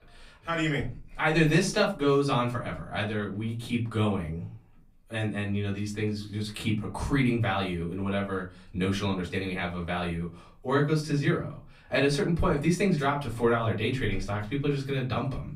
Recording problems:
off-mic speech; far
room echo; very slight; dies away in 0.3 s

